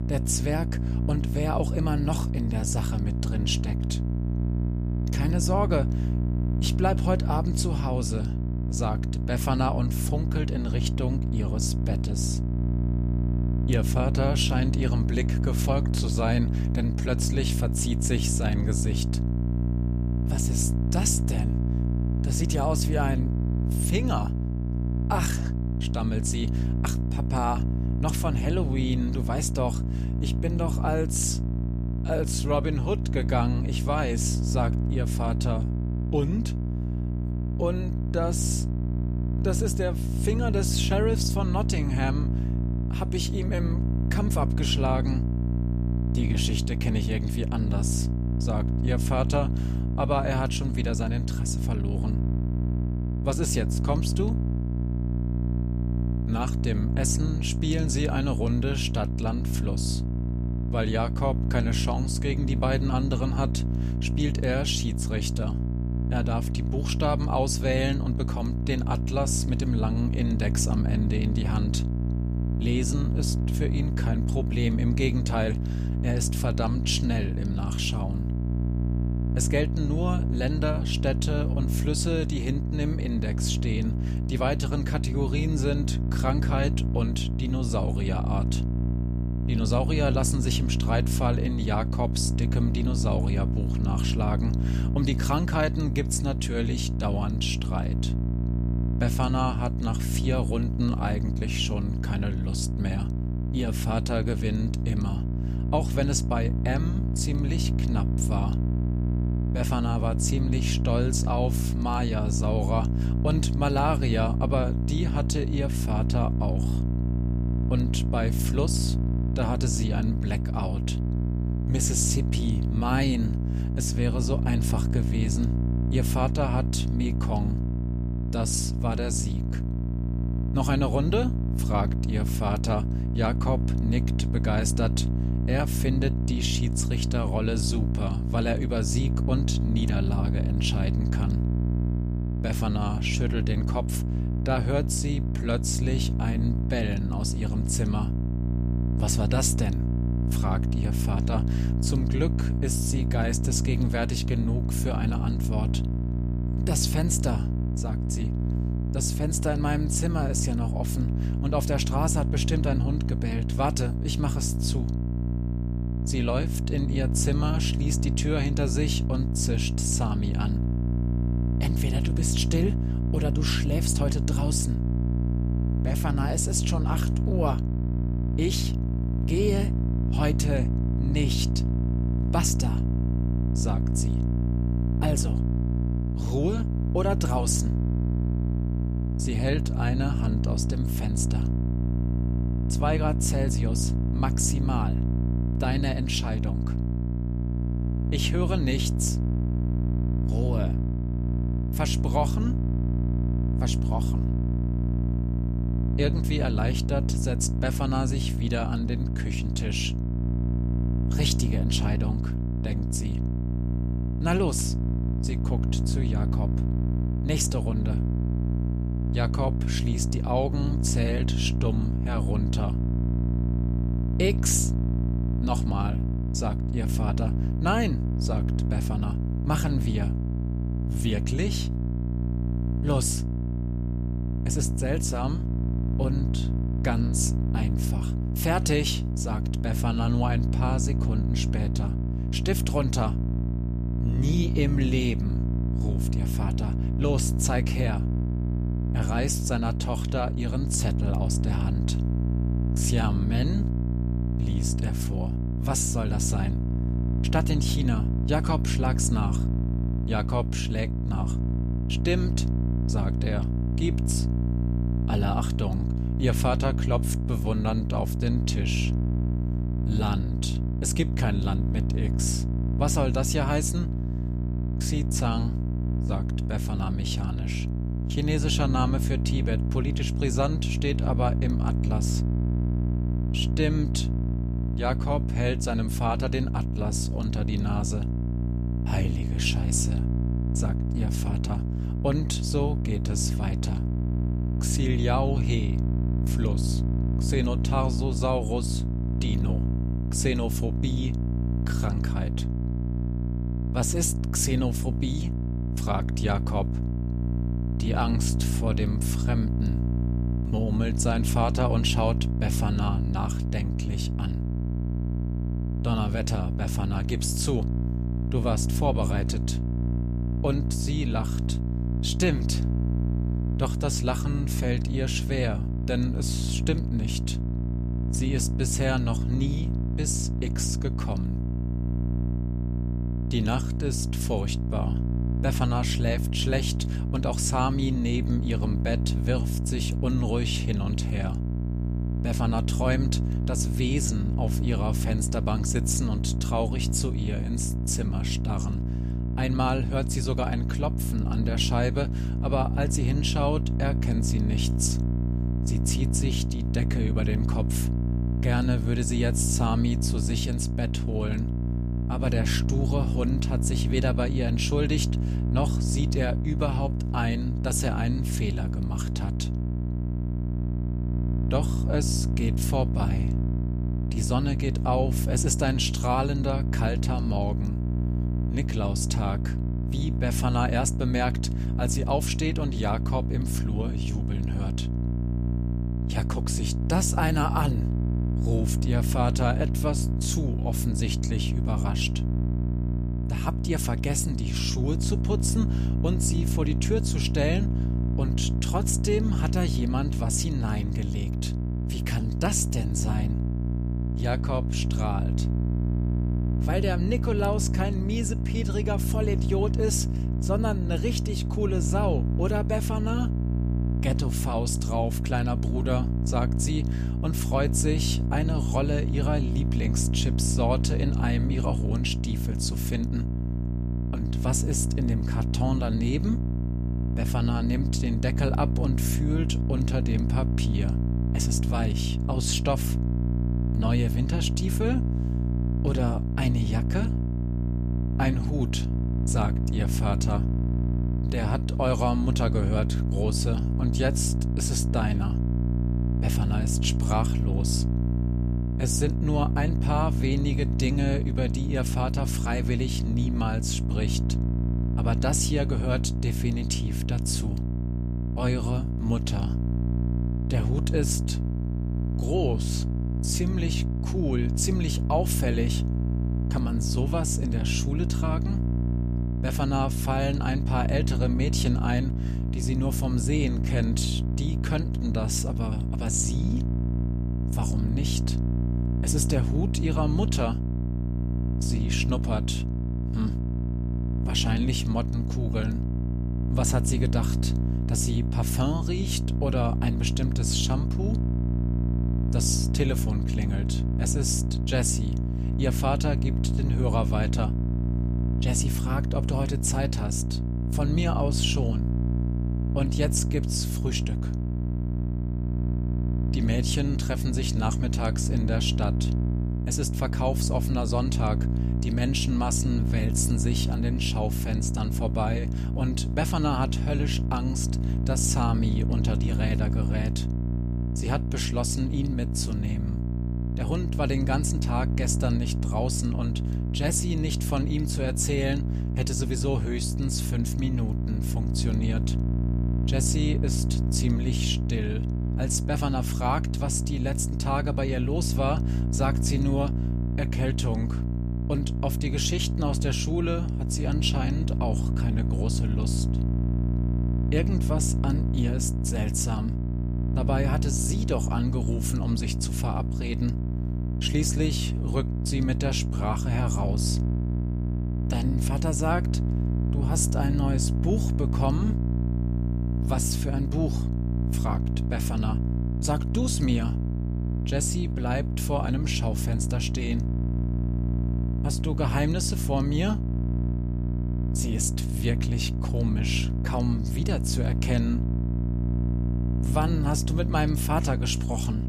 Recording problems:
electrical hum; loud; throughout; 60 Hz, 6 dB below the speech

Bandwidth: 14.5 kHz